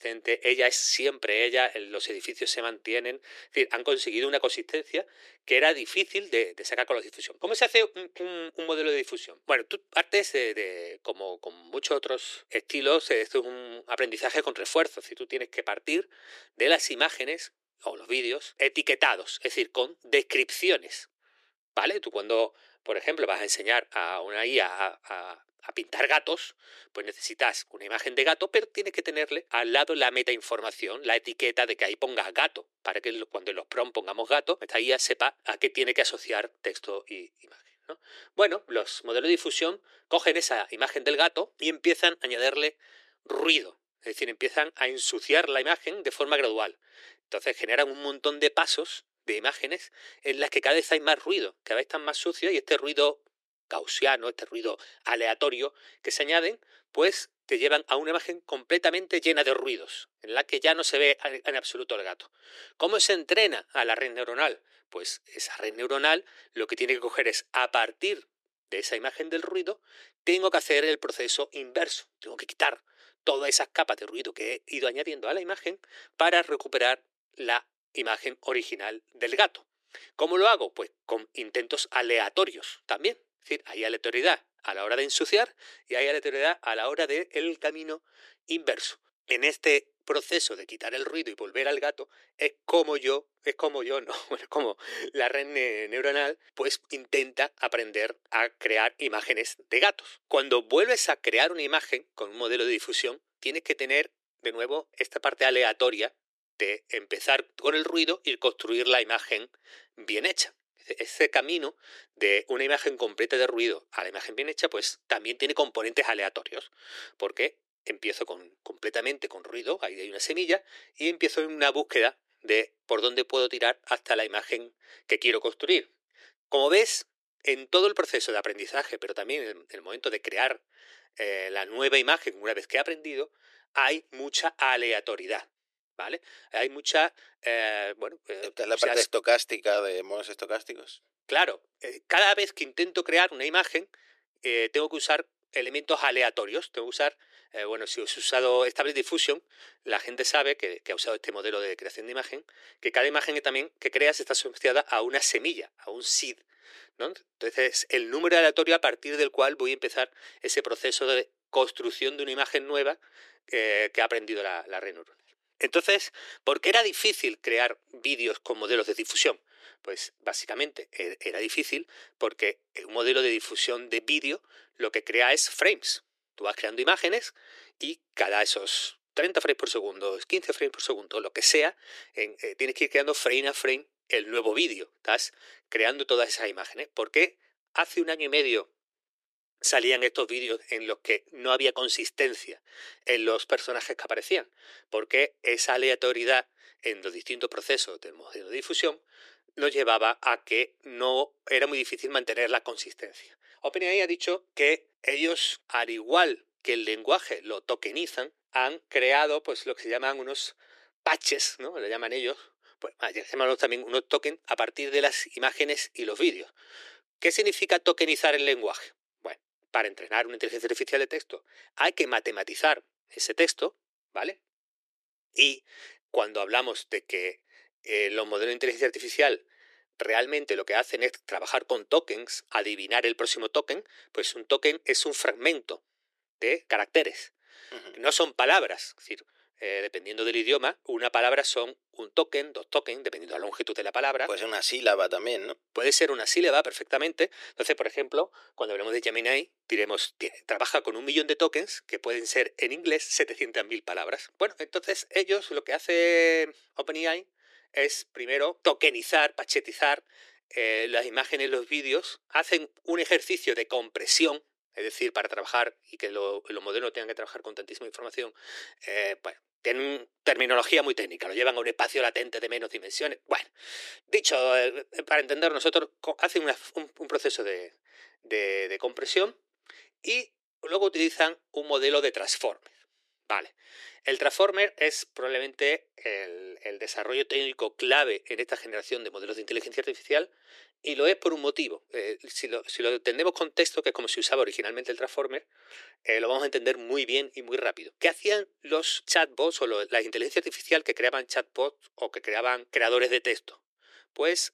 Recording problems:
thin; very; fading below 350 Hz

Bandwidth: 14 kHz